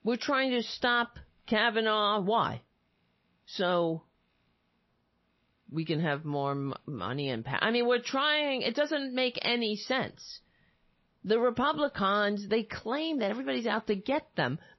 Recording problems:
garbled, watery; slightly; nothing above 5.5 kHz

